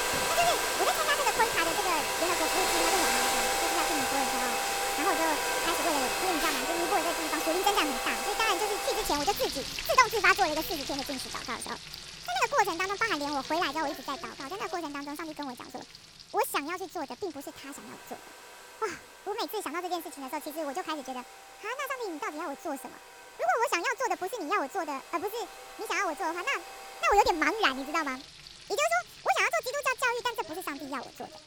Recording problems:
wrong speed and pitch; too fast and too high; 1.5 times normal speed
household noises; very loud; throughout; as loud as the speech

